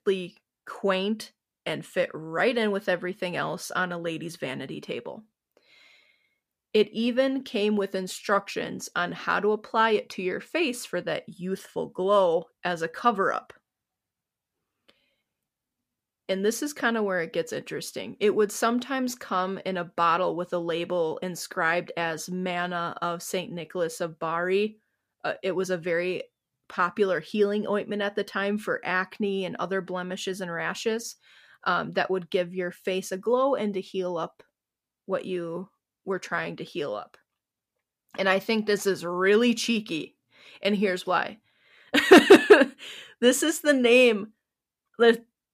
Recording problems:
none

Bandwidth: 15 kHz